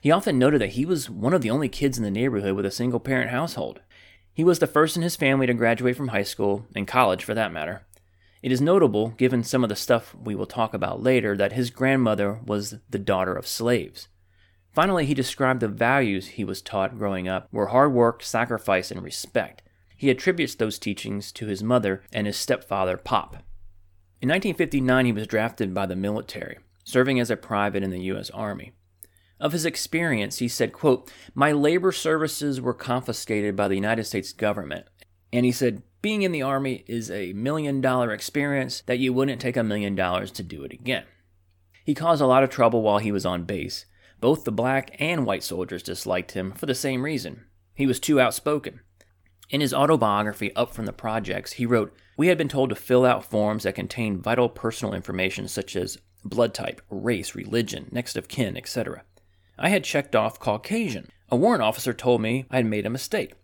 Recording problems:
none

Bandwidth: 18 kHz